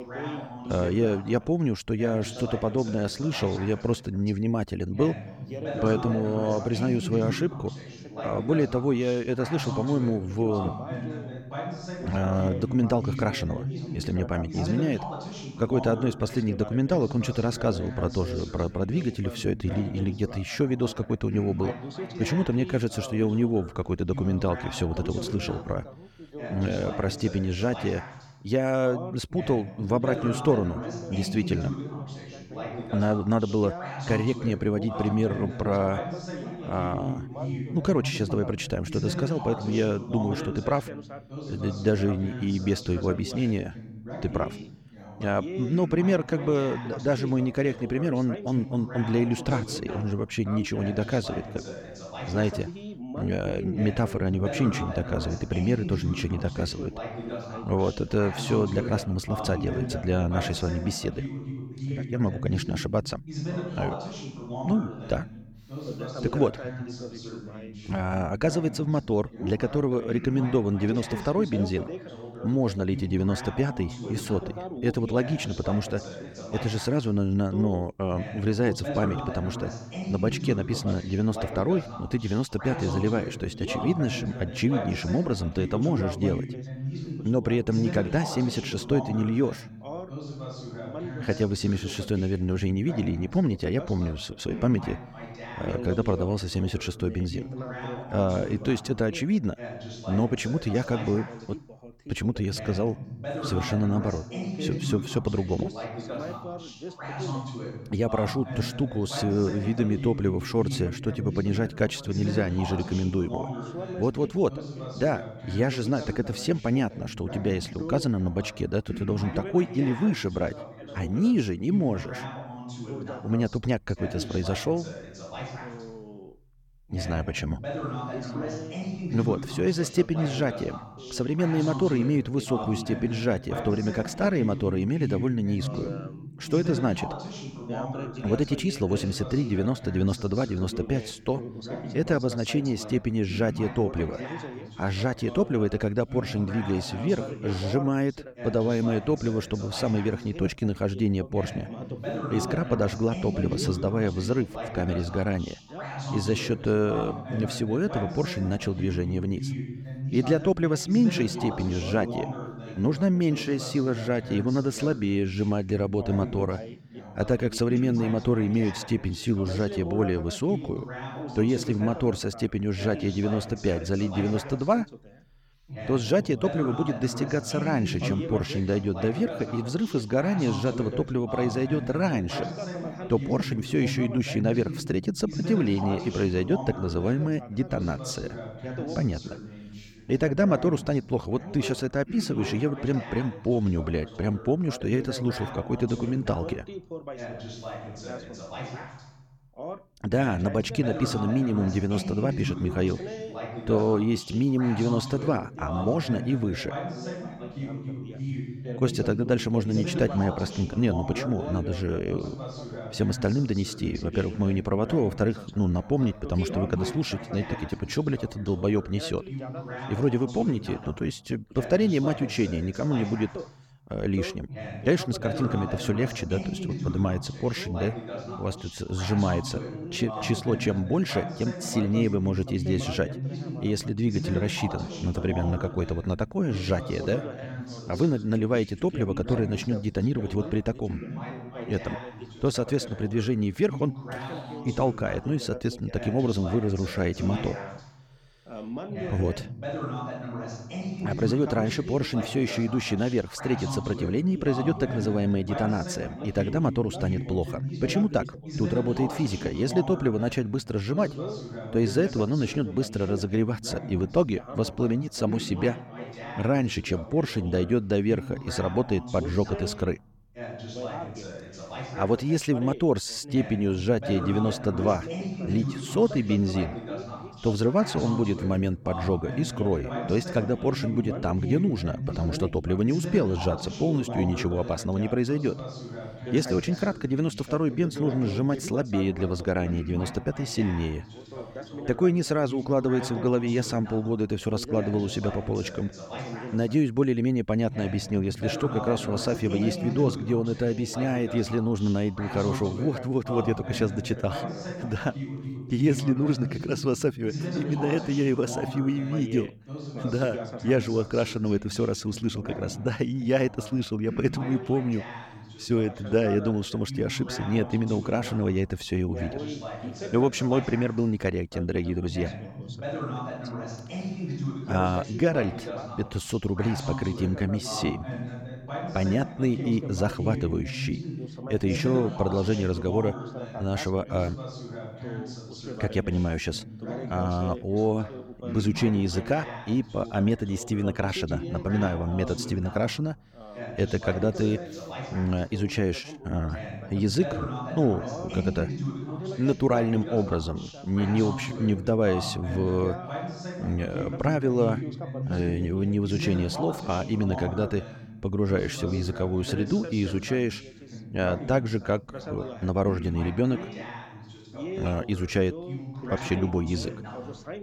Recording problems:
background chatter; loud; throughout; 2 voices, 9 dB below the speech

